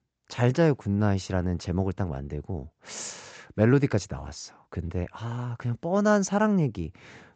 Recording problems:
high frequencies cut off; noticeable; nothing above 8 kHz

